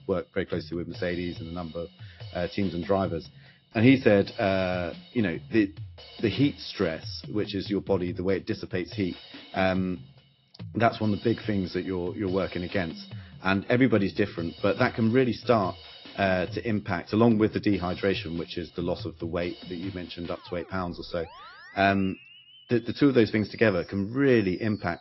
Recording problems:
high frequencies cut off; noticeable; nothing above 5.5 kHz
garbled, watery; slightly
background music; noticeable; throughout; 15 dB below the speech

